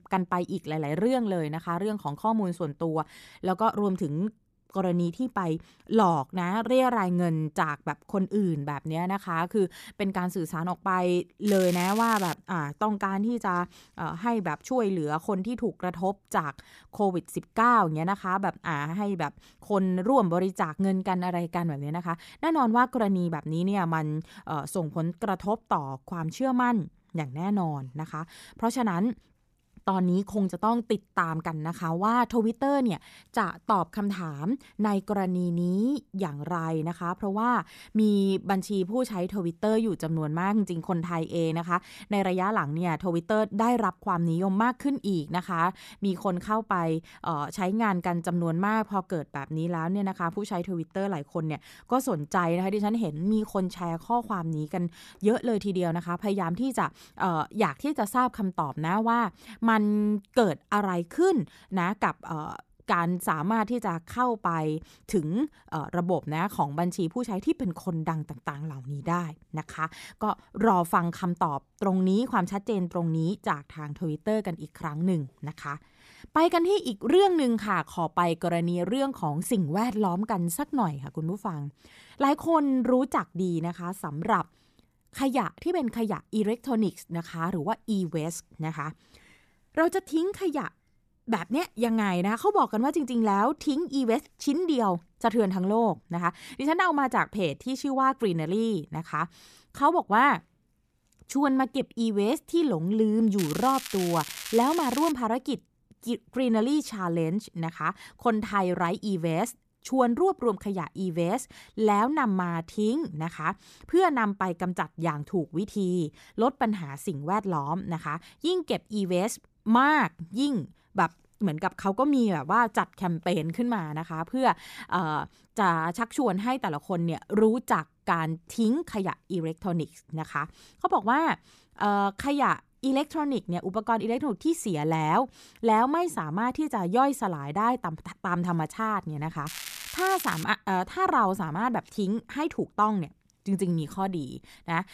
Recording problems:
crackling; loud; at 11 s, from 1:43 to 1:45 and at 2:19; 10 dB below the speech

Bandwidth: 14.5 kHz